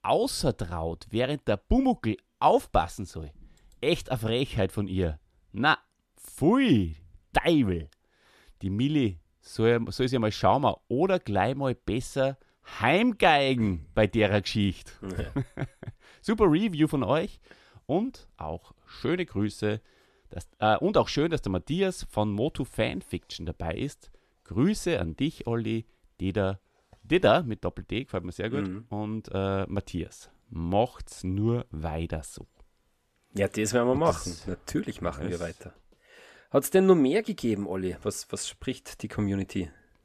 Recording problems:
none

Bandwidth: 14 kHz